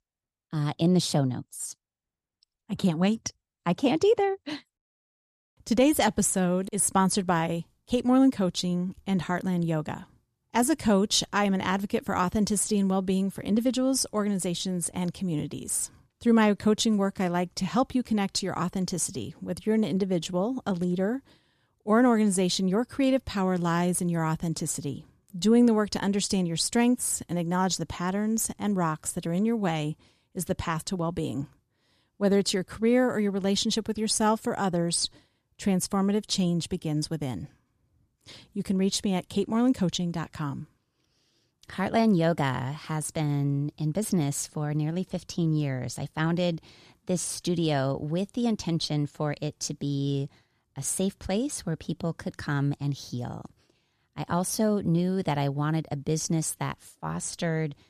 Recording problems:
none

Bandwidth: 14 kHz